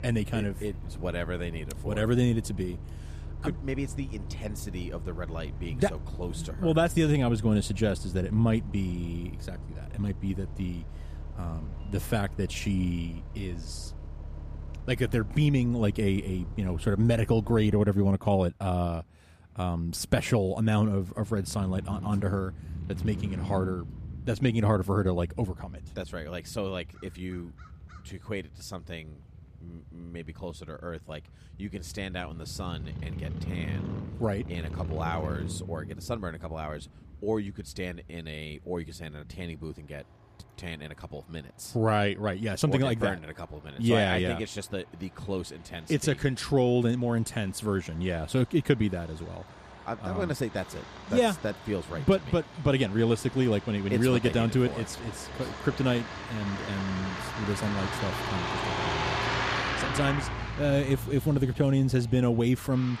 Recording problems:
traffic noise; loud; throughout; 9 dB below the speech

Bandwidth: 14.5 kHz